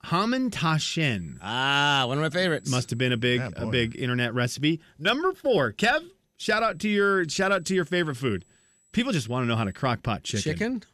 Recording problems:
high-pitched whine; faint; from 1 to 4 s and from 6.5 to 10 s; 8 kHz, 35 dB below the speech

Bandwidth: 13.5 kHz